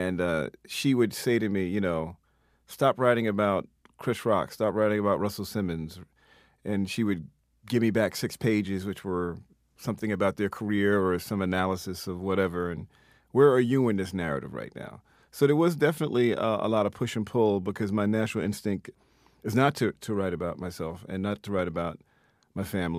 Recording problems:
abrupt cut into speech; at the start and the end

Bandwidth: 15 kHz